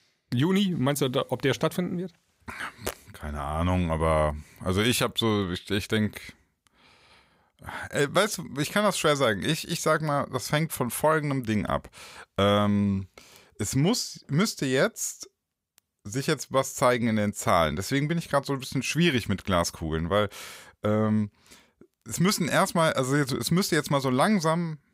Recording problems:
none

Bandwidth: 15.5 kHz